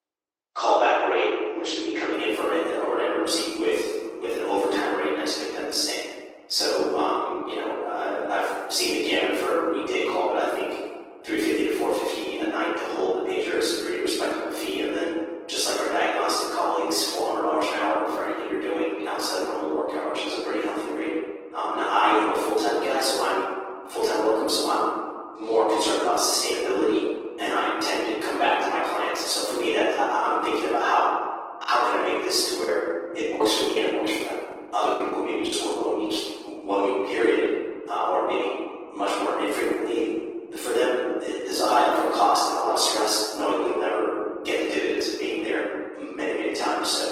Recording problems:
room echo; strong; dies away in 1.7 s
off-mic speech; far
thin; very; fading below 300 Hz
garbled, watery; slightly; nothing above 16.5 kHz
choppy; very; from 32 to 36 s; 13% of the speech affected

